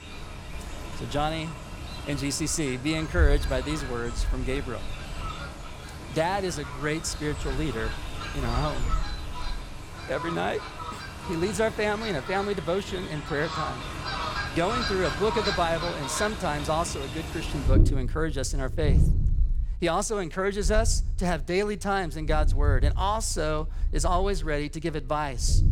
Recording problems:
animal sounds; loud; throughout; 3 dB below the speech

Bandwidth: 18.5 kHz